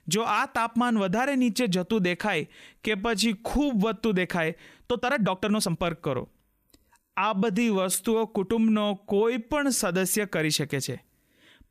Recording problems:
uneven, jittery; strongly; from 3 to 10 s

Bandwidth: 14.5 kHz